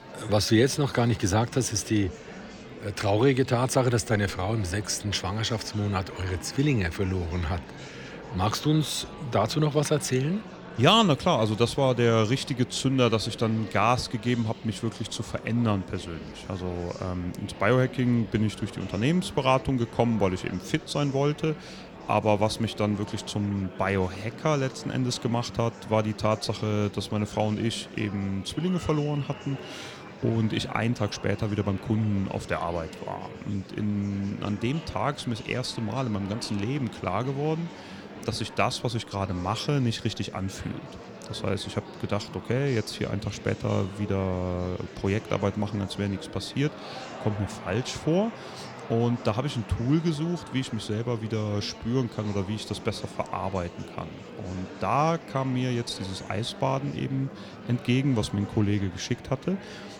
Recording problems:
murmuring crowd; noticeable; throughout; 15 dB below the speech

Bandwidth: 18 kHz